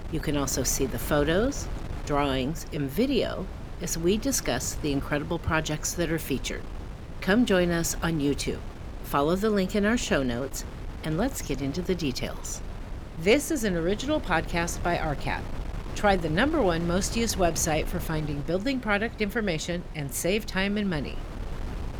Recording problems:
wind noise on the microphone; occasional gusts; 15 dB below the speech

